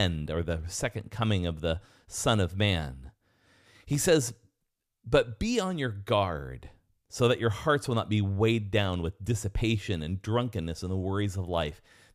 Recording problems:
abrupt cut into speech; at the start

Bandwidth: 14.5 kHz